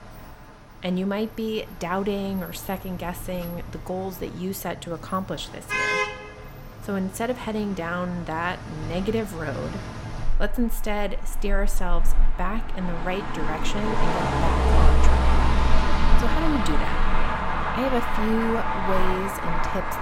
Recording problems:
traffic noise; very loud; throughout; 3 dB above the speech
doorbell; noticeable; from 16 to 17 s; peak 9 dB below the speech

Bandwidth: 16.5 kHz